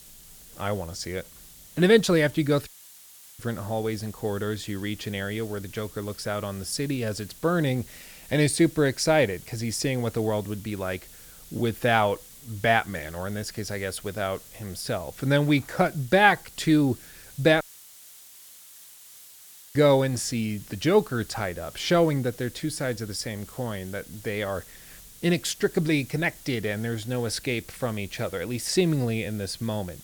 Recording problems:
hiss; noticeable; throughout; 20 dB below the speech
audio cutting out; at 2.5 s for 0.5 s and at 18 s for 2 s

